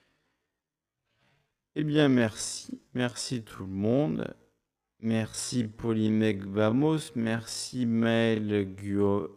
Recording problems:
wrong speed, natural pitch; too slow; 0.5 times normal speed

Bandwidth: 14.5 kHz